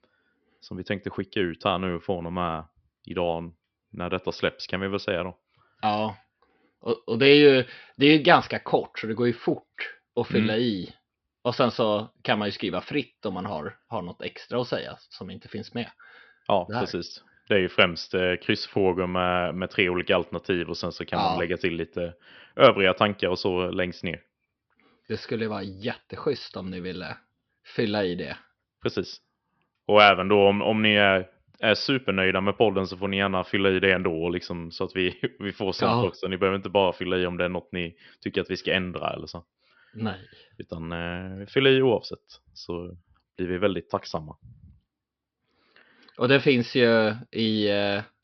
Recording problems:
high frequencies cut off; noticeable; nothing above 5.5 kHz

